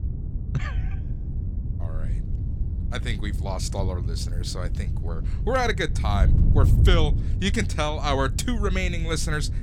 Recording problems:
wind noise on the microphone; occasional gusts; 15 dB below the speech

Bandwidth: 17 kHz